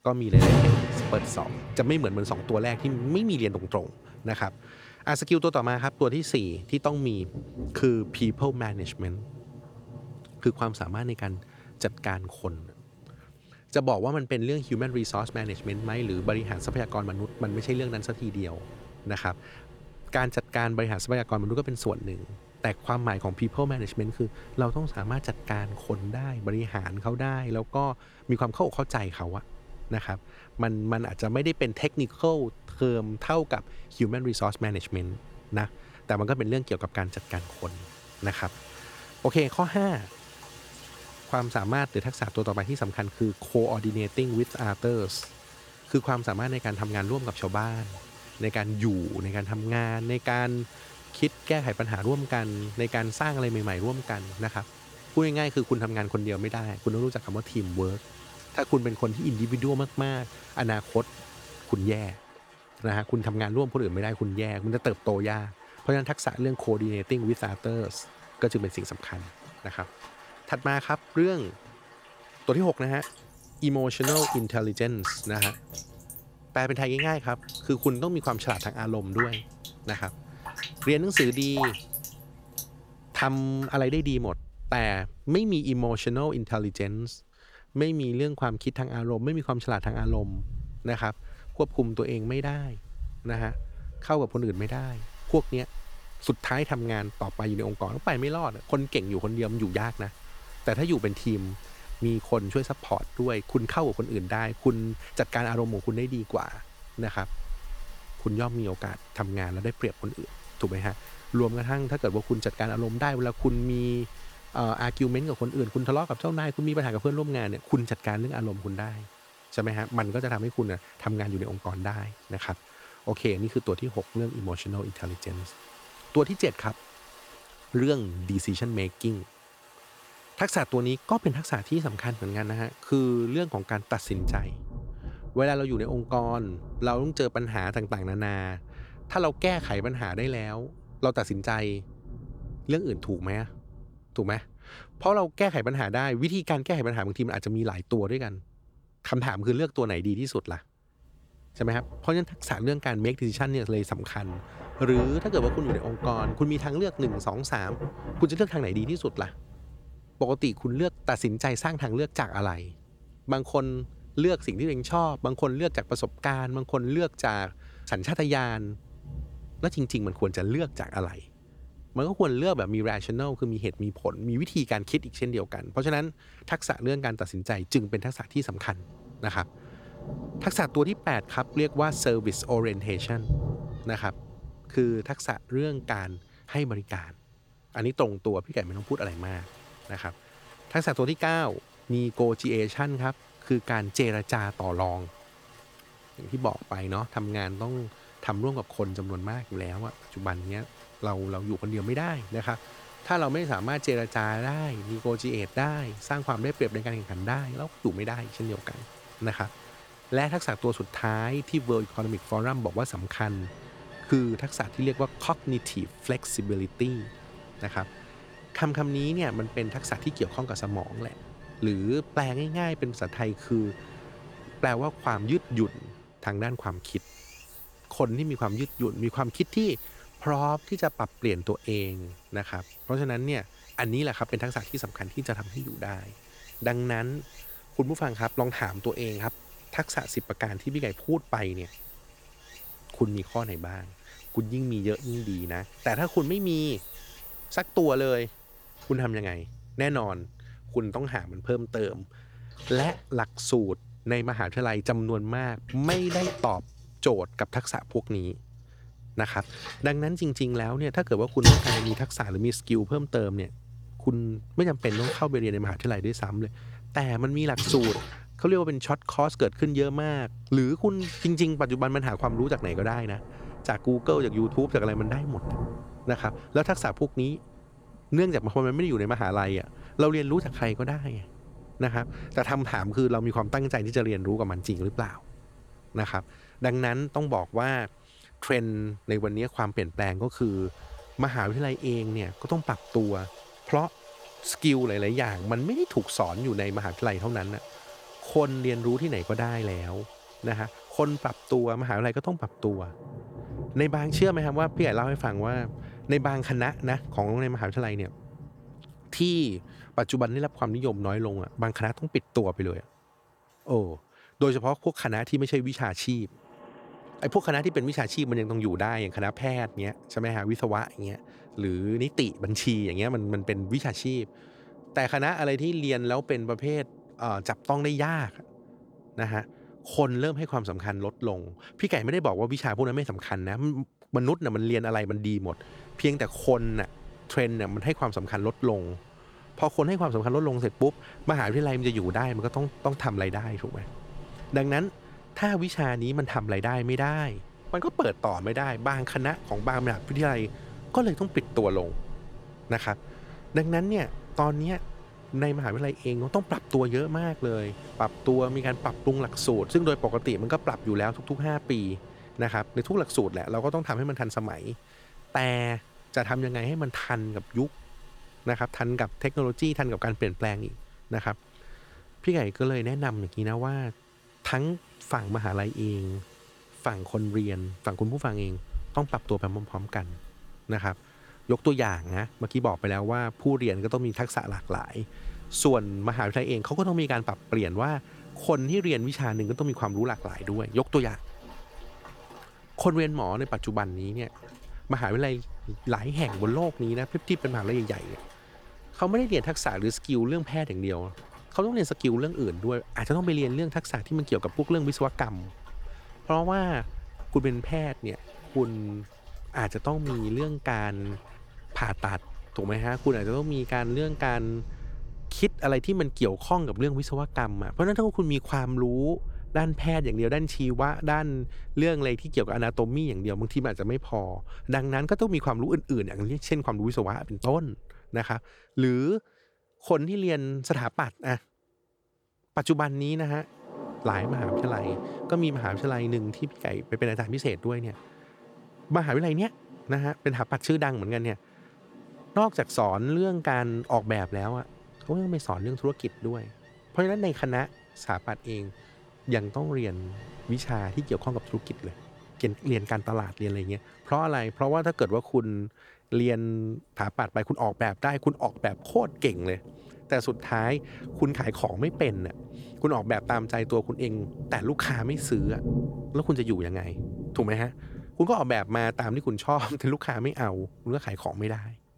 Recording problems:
rain or running water; noticeable; throughout; 10 dB below the speech

